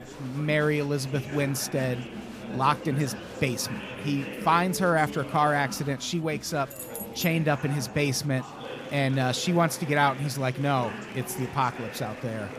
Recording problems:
chatter from many people; noticeable; throughout; 10 dB below the speech
jangling keys; noticeable; at 6.5 s; peak 10 dB below the speech

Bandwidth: 15 kHz